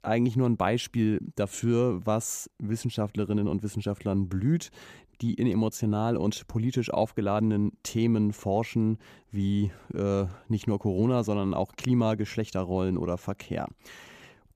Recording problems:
none

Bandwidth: 14.5 kHz